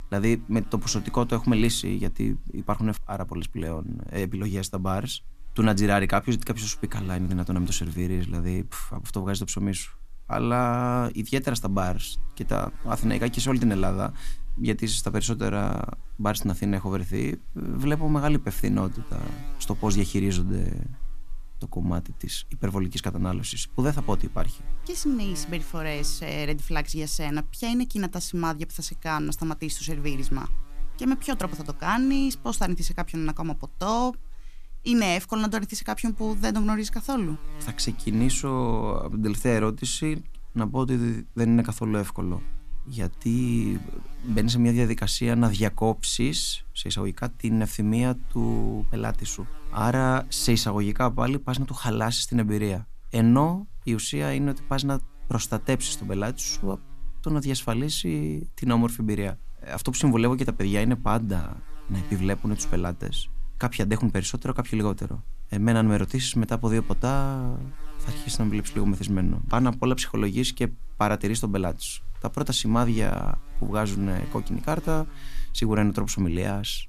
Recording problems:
electrical hum; faint; throughout; 50 Hz, 25 dB below the speech

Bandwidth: 14.5 kHz